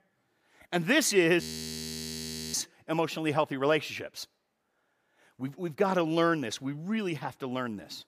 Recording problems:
audio freezing; at 1.5 s for 1 s

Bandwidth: 15 kHz